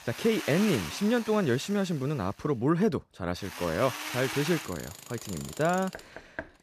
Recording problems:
machinery noise; loud; throughout; 9 dB below the speech
door banging; faint; at 6 s; peak 15 dB below the speech

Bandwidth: 14.5 kHz